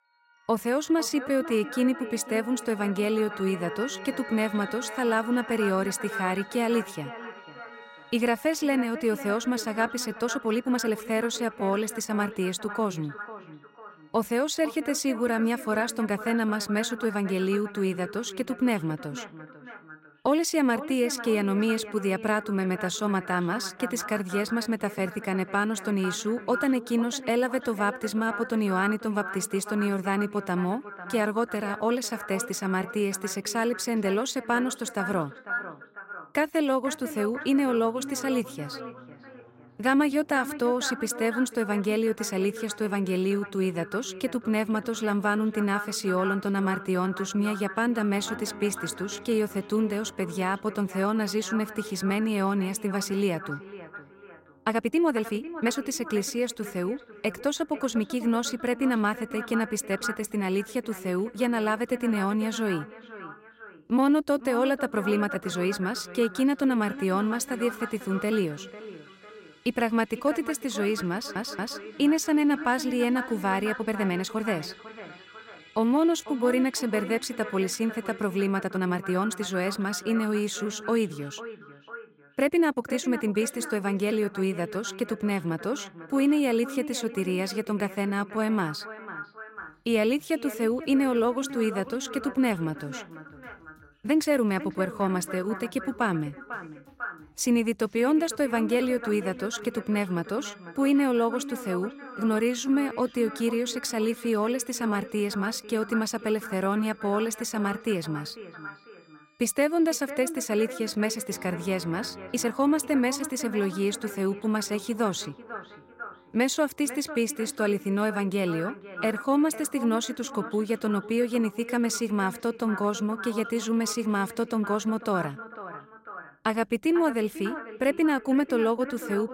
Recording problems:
echo of what is said; noticeable; throughout; 500 ms later, 10 dB below the speech
background music; faint; throughout; 25 dB below the speech
uneven, jittery; strongly; from 1 s to 2:03
audio stuttering; at 1:11

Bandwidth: 16 kHz